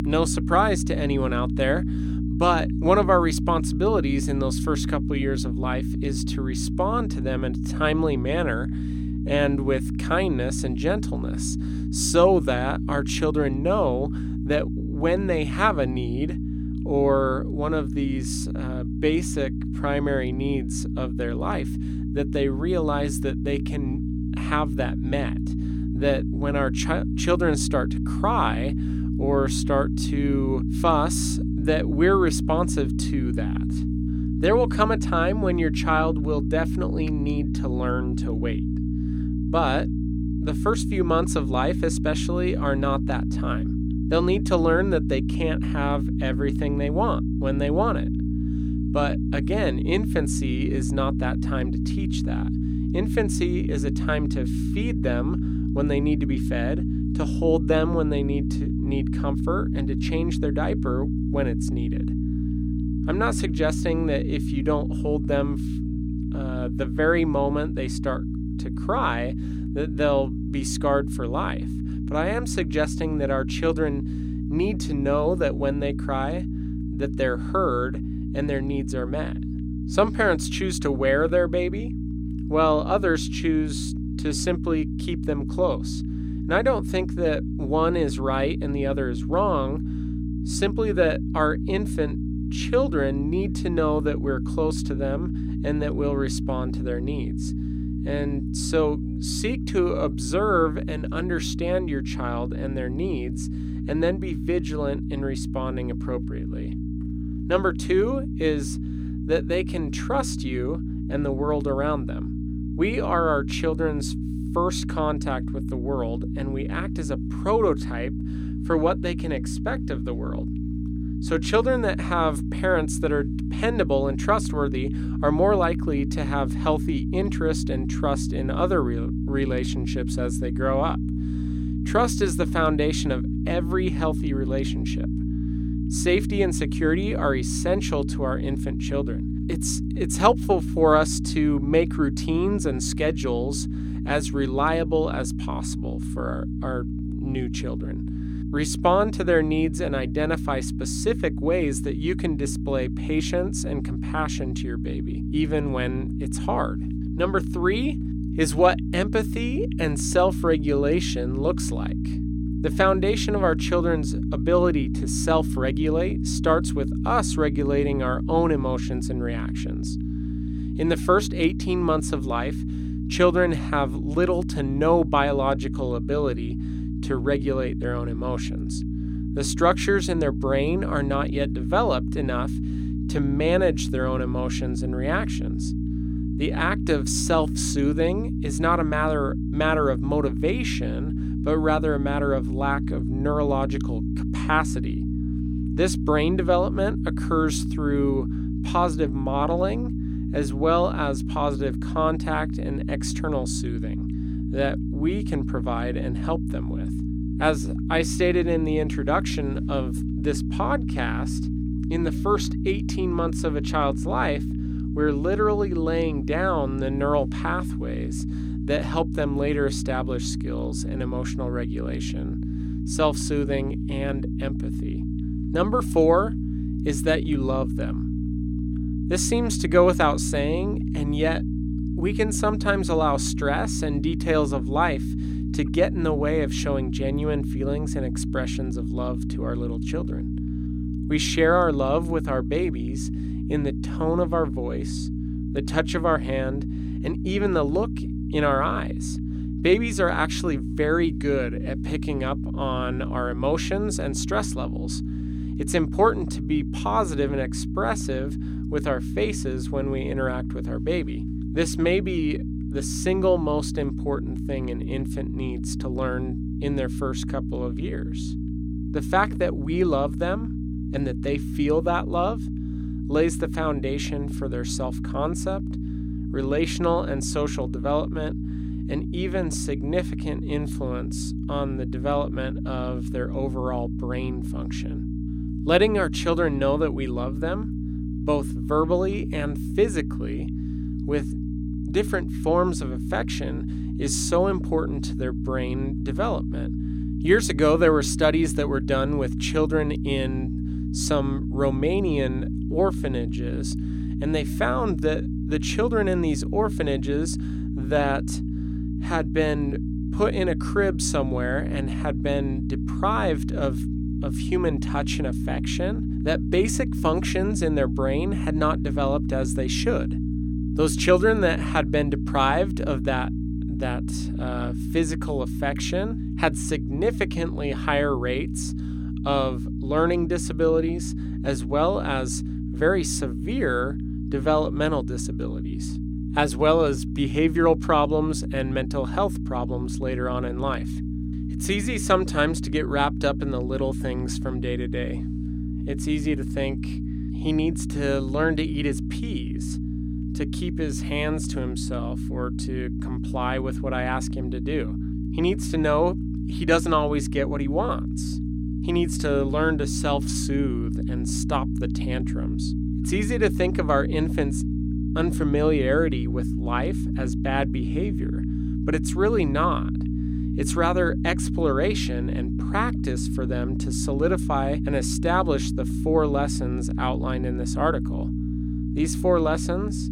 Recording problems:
electrical hum; loud; throughout; 60 Hz, 10 dB below the speech

